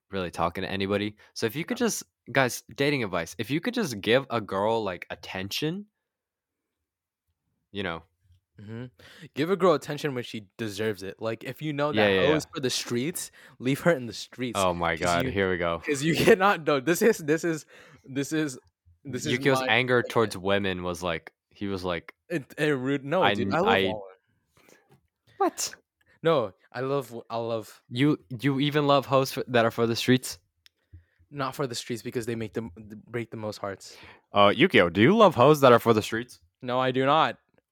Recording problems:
none

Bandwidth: 18.5 kHz